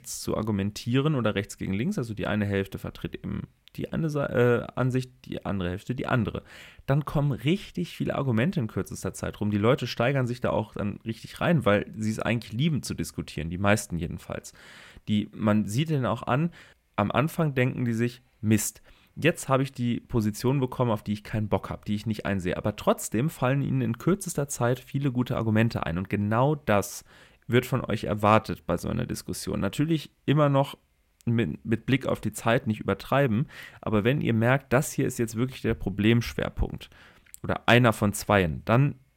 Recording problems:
none

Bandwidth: 16 kHz